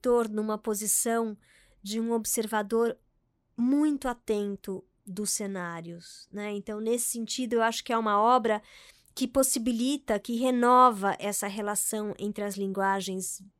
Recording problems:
none

